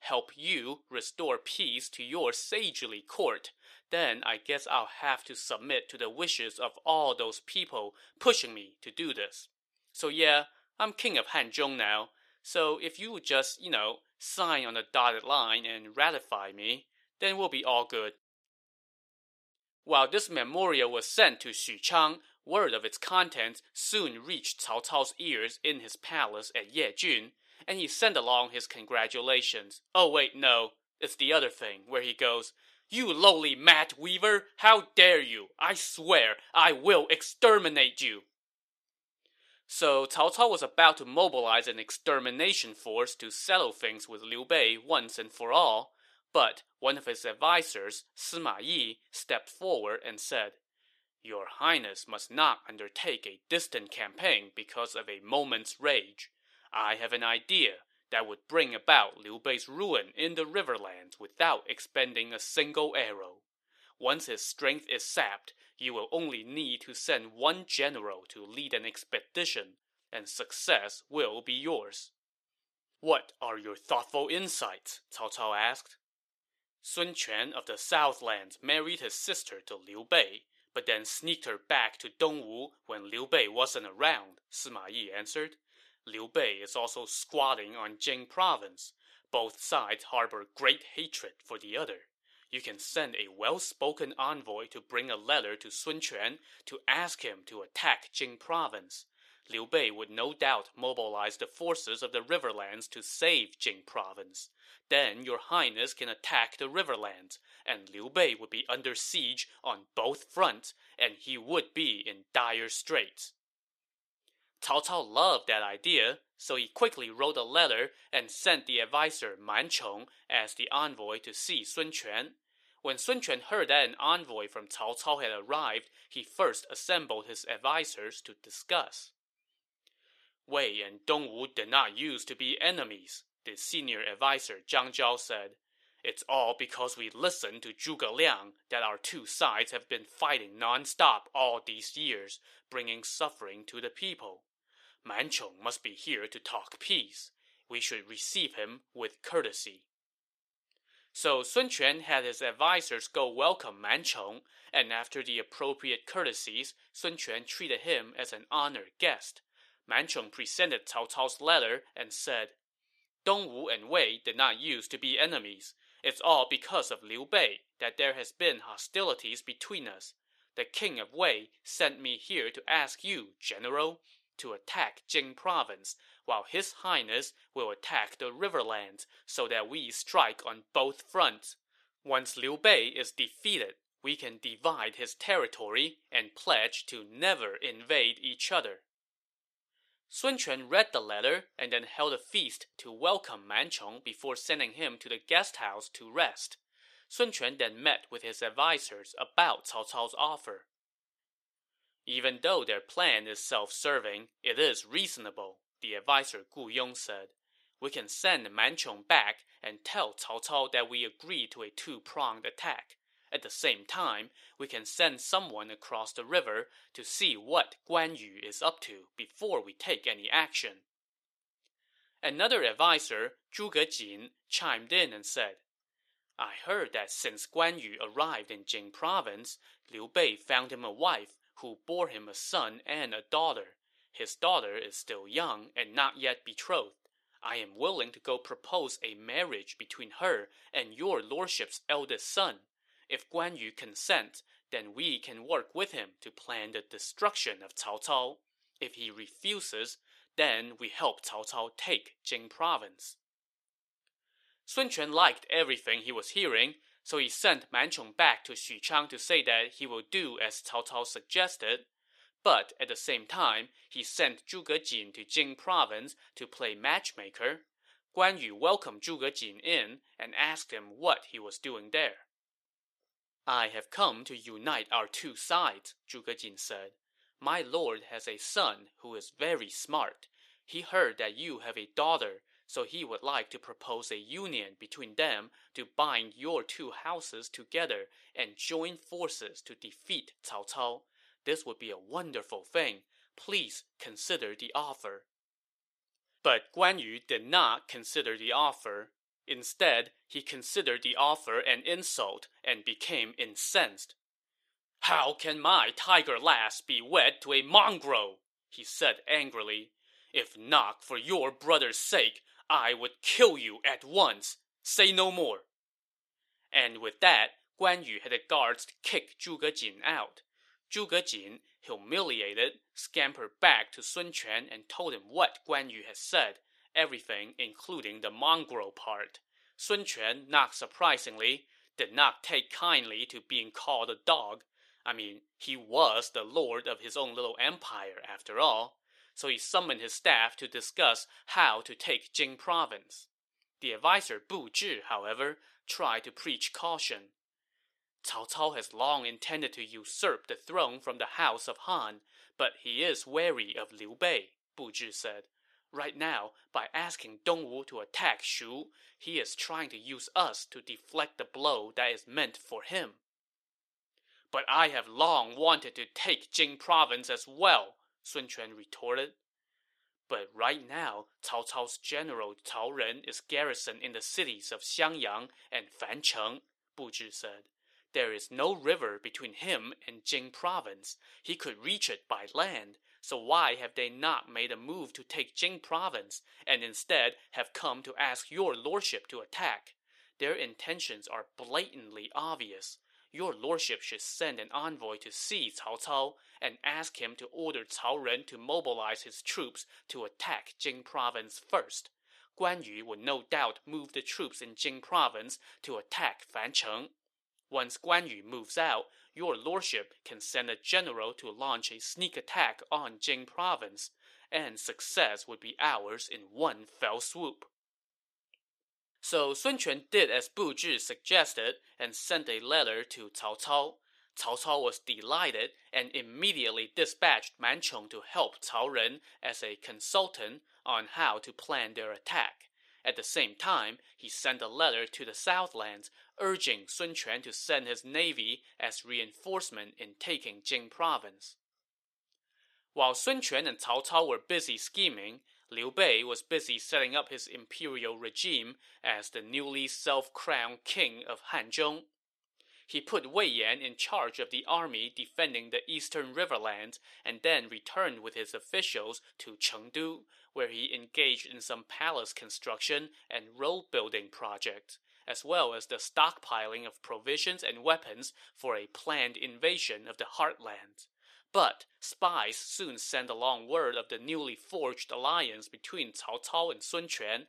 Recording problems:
thin; somewhat; fading below 450 Hz

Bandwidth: 14 kHz